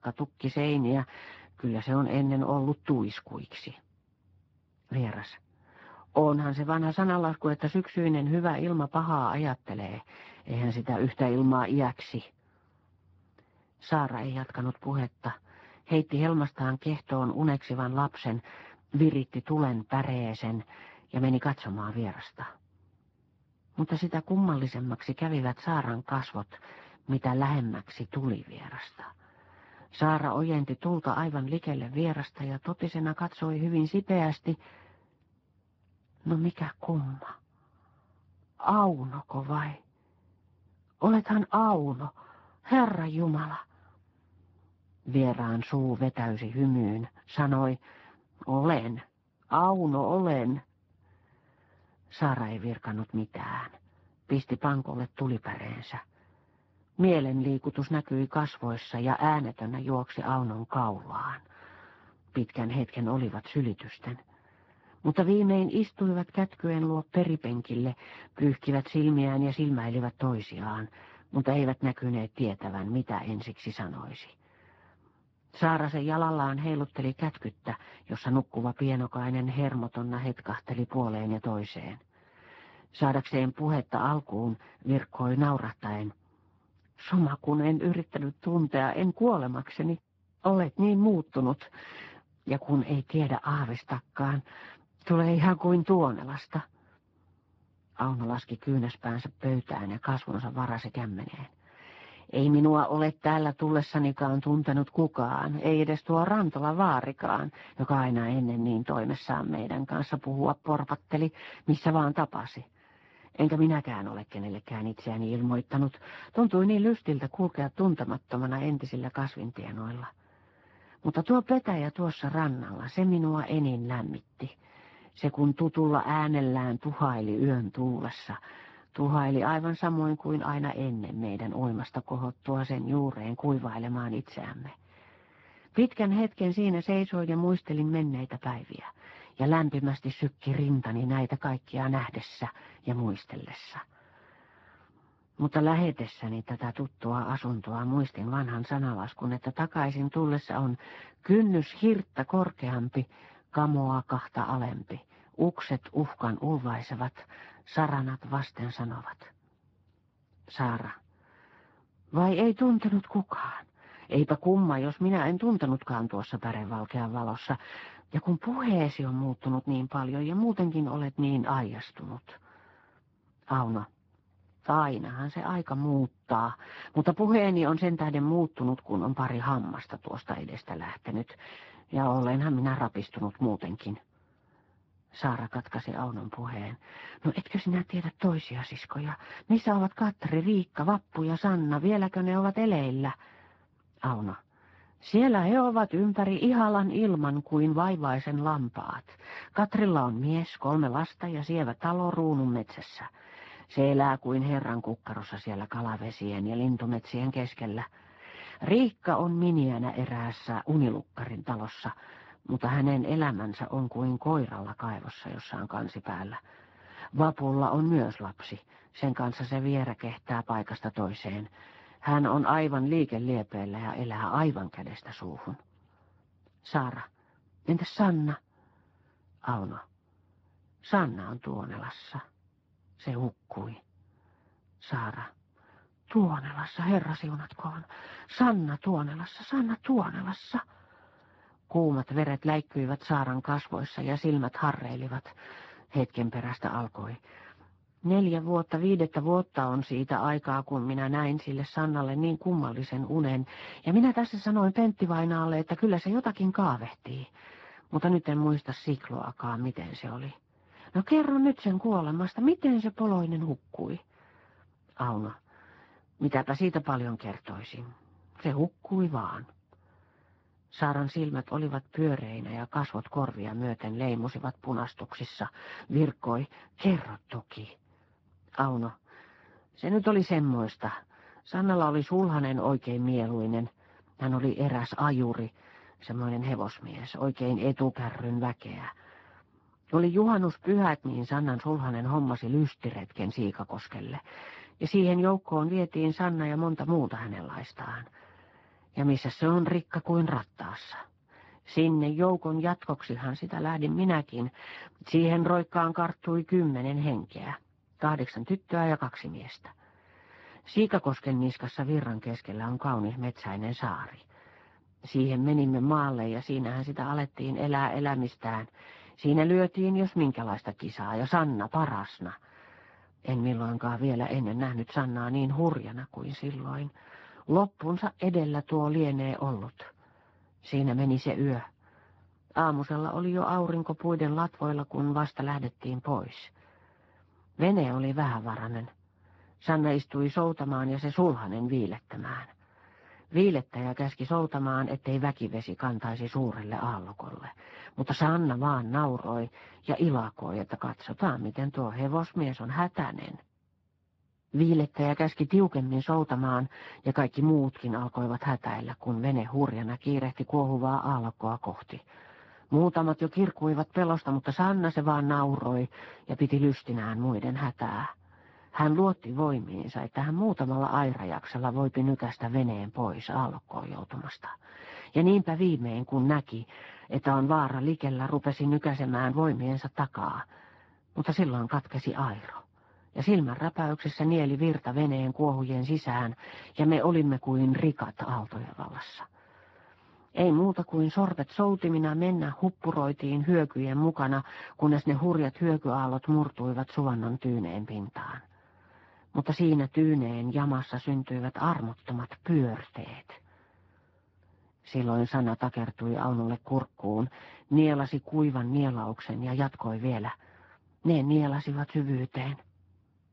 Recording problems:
garbled, watery; badly
muffled; very; fading above 2 kHz

